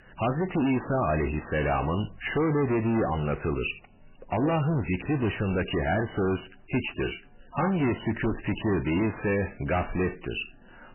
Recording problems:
distortion; heavy; 6 dB below the speech
garbled, watery; badly; nothing above 3 kHz

